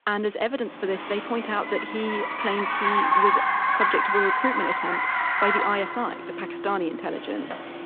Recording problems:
phone-call audio
traffic noise; very loud; throughout; 5 dB above the speech

